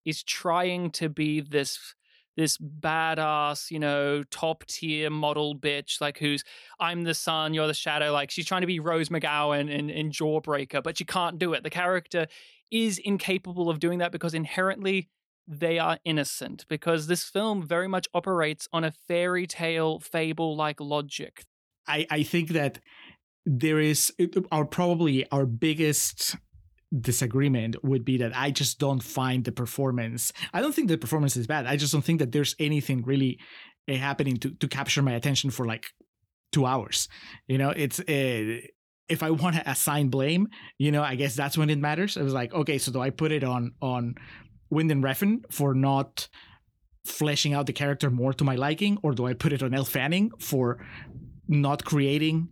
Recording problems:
none

